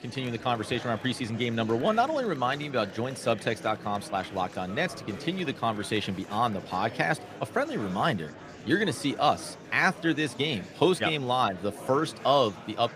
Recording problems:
murmuring crowd; noticeable; throughout; 15 dB below the speech

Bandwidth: 15 kHz